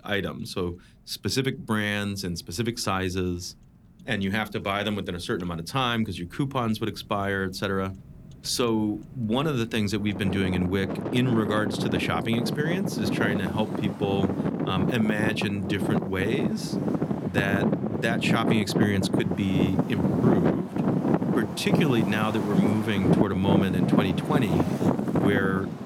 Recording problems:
traffic noise; very loud; throughout; 1 dB above the speech

